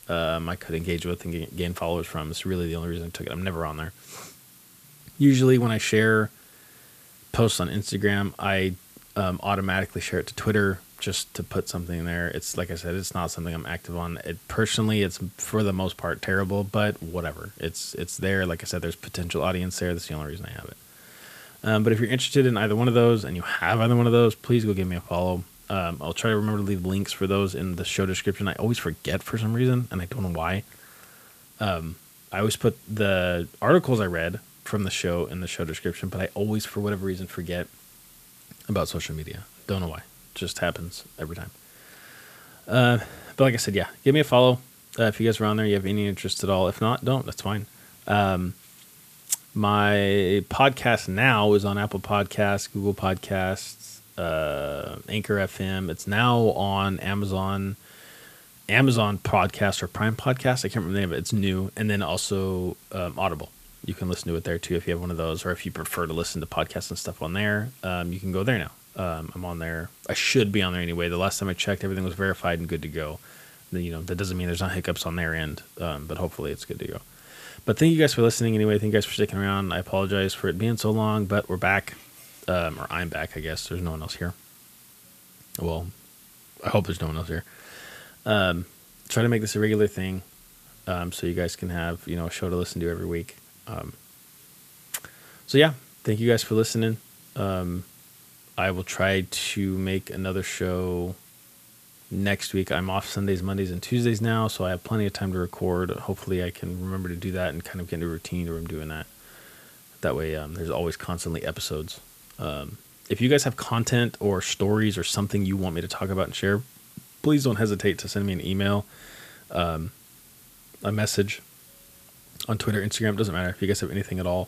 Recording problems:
hiss; faint; throughout; 25 dB below the speech

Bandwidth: 14.5 kHz